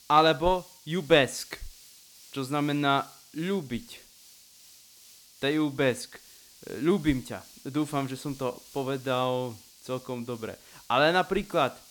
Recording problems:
hiss; faint; throughout; 20 dB below the speech

